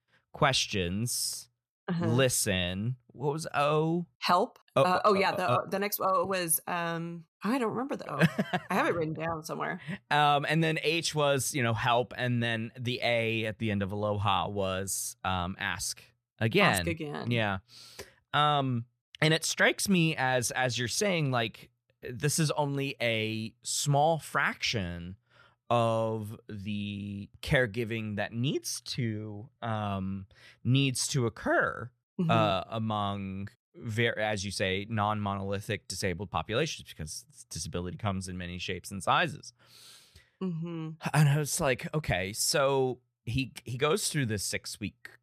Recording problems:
none

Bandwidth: 14.5 kHz